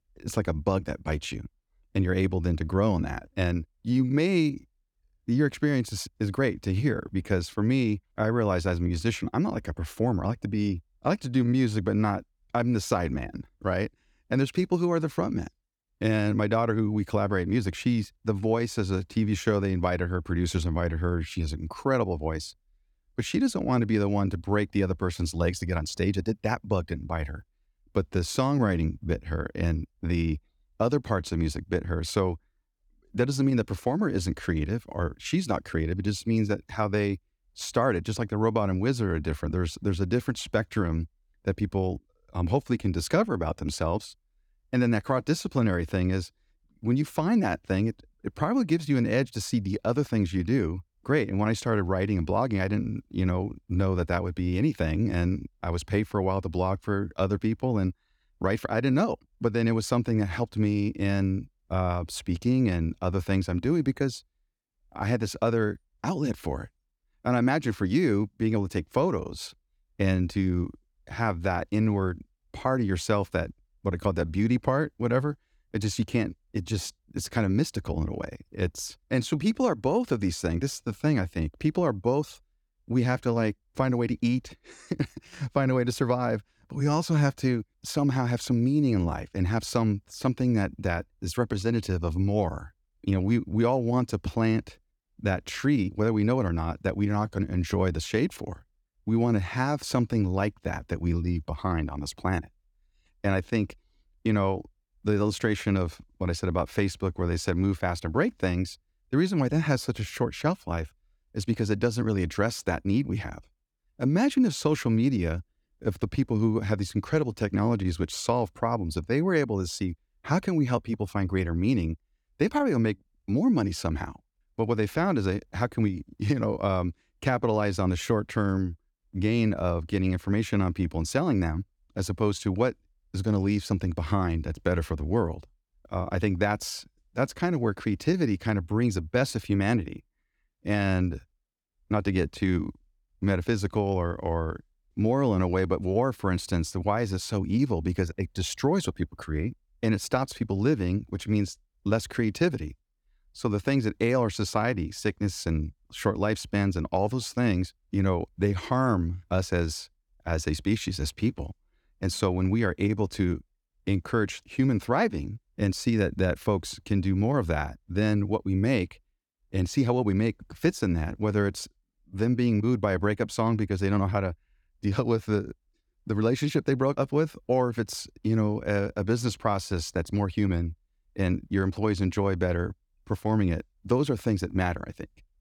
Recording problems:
none

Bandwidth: 18.5 kHz